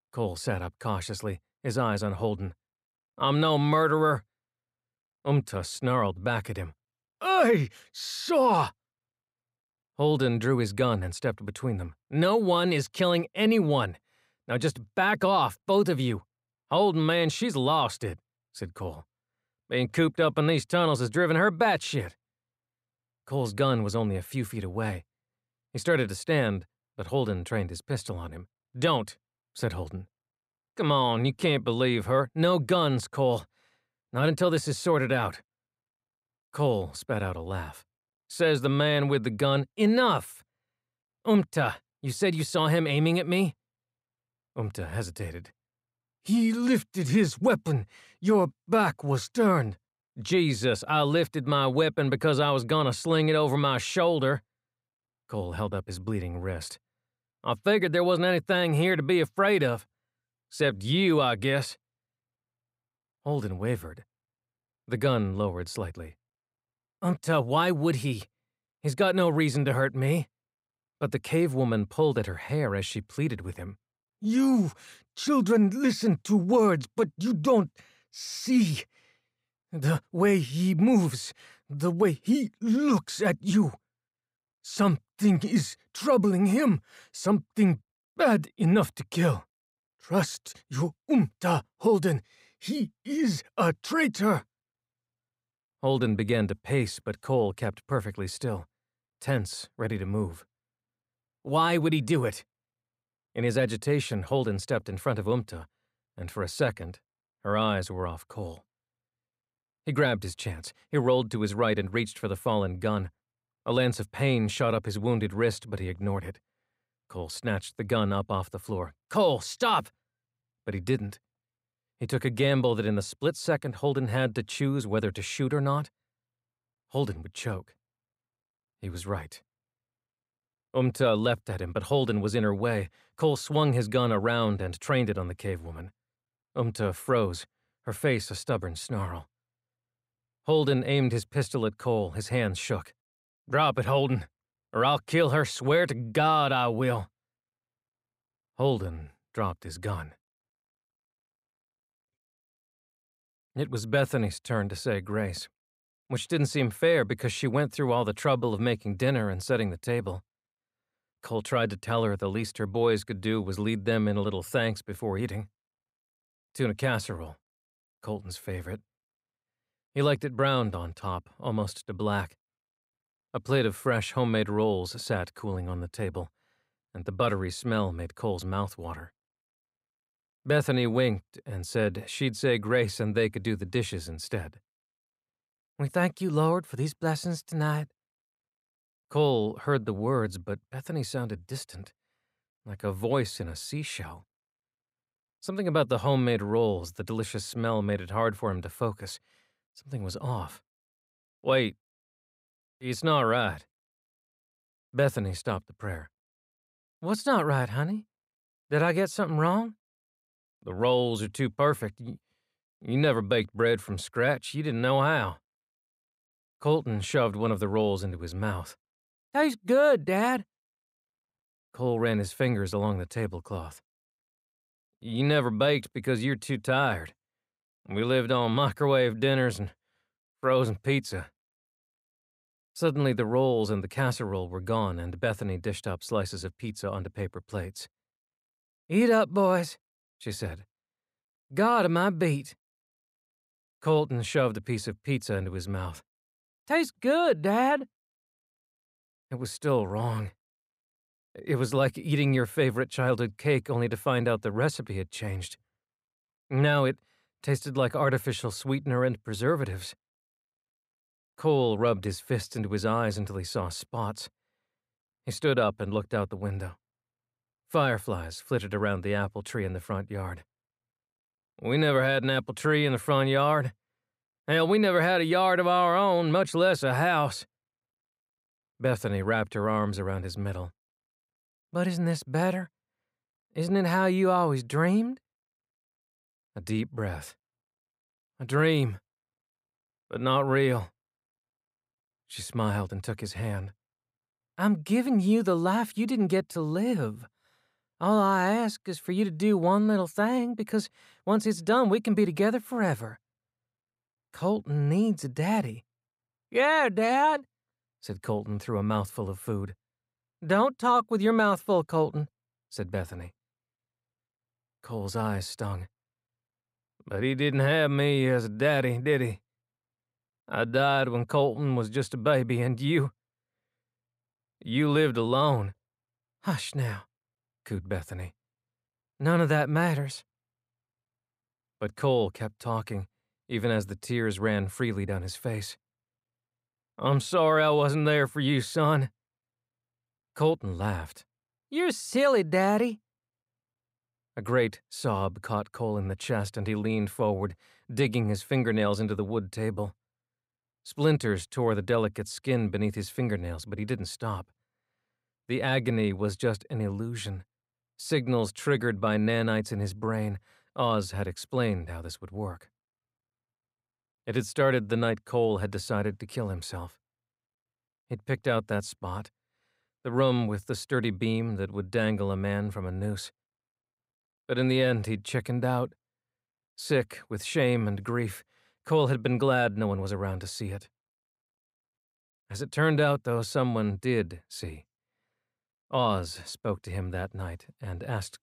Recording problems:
none

